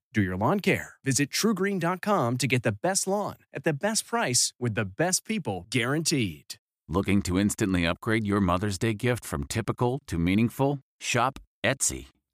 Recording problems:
none

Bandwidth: 15 kHz